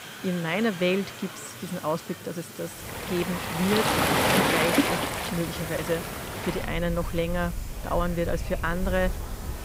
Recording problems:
rain or running water; very loud; from 3 s on; 1 dB above the speech
murmuring crowd; noticeable; throughout; 15 dB below the speech
hiss; noticeable; throughout; 15 dB below the speech

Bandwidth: 15.5 kHz